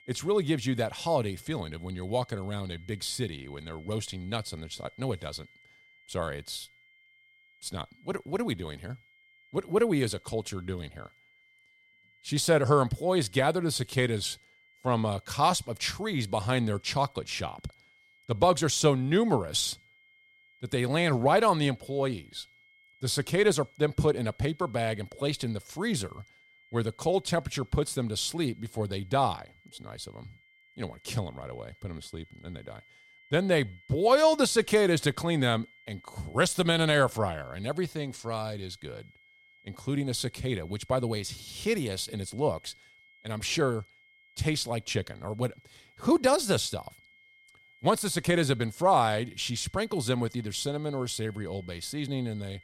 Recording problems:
high-pitched whine; faint; throughout; 2 kHz, 30 dB below the speech

